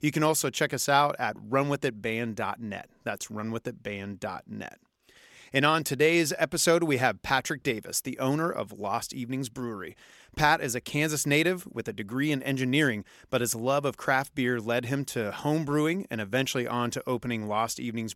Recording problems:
none

